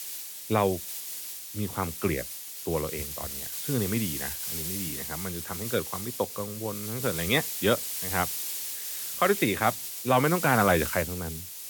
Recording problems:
high frequencies cut off; severe; nothing above 4 kHz
hiss; loud; throughout; 4 dB below the speech

